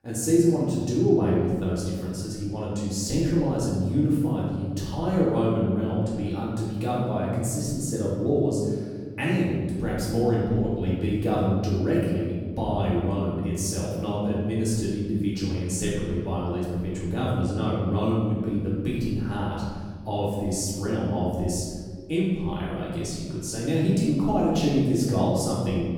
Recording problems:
off-mic speech; far
room echo; noticeable; dies away in 1.7 s

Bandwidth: 18 kHz